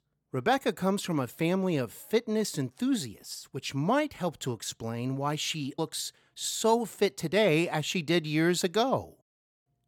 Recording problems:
none

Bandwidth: 17.5 kHz